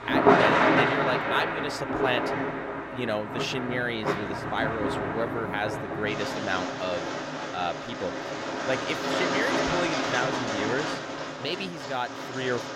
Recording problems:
rain or running water; very loud; throughout; 4 dB above the speech
voice in the background; very faint; throughout; 25 dB below the speech

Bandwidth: 16.5 kHz